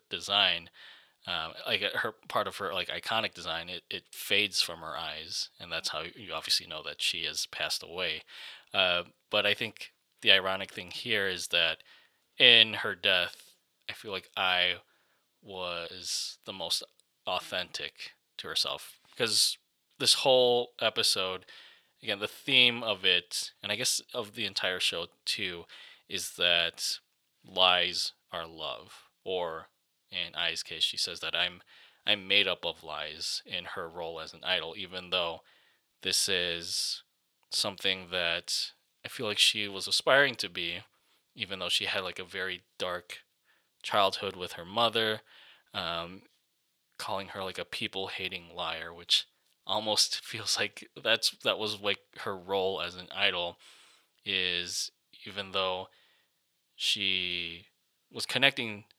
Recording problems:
thin; somewhat; fading below 1 kHz

